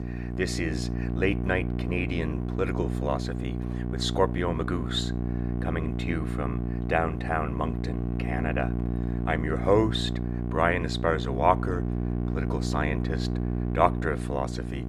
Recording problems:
electrical hum; loud; throughout; 60 Hz, 9 dB below the speech

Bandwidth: 15 kHz